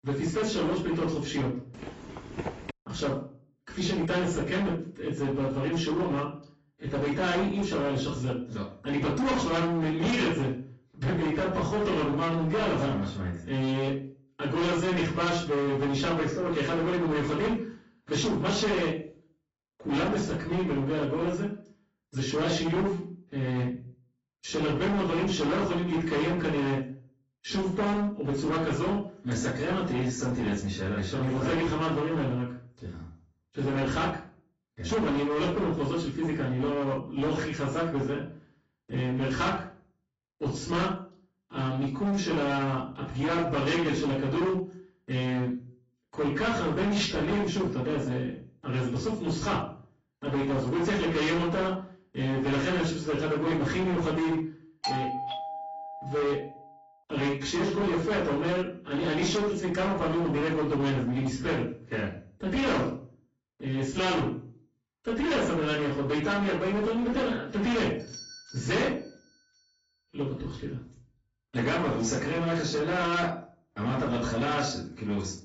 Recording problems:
distortion; heavy; 19% of the sound clipped
off-mic speech; far
garbled, watery; badly; nothing above 7.5 kHz
room echo; slight; dies away in 0.4 s
footsteps; noticeable; at 1.5 s; peak 9 dB below the speech
doorbell; noticeable; from 55 to 57 s; peak 2 dB below the speech
doorbell; faint; from 1:08 to 1:09; peak 15 dB below the speech

